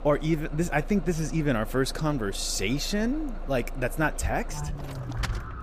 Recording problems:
traffic noise; noticeable; throughout; 10 dB below the speech

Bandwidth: 15 kHz